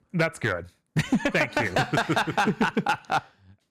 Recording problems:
distortion; slight; 4% of the sound clipped

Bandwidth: 14.5 kHz